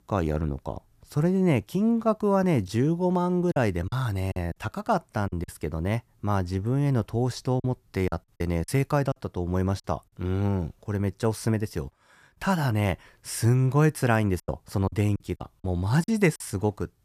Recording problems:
choppy; very; from 3.5 to 5.5 s, from 7.5 to 10 s and from 14 to 16 s; 11% of the speech affected

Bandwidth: 14.5 kHz